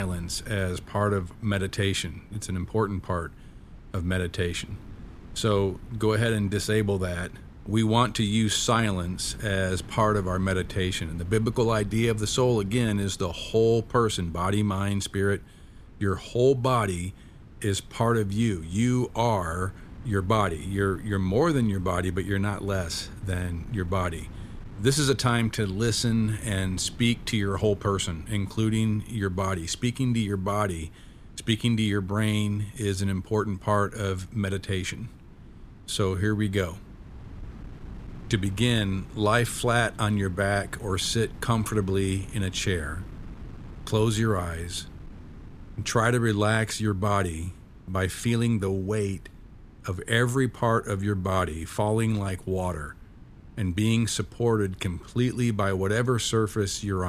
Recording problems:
wind noise on the microphone; occasional gusts; 25 dB below the speech
abrupt cut into speech; at the start and the end

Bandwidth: 14.5 kHz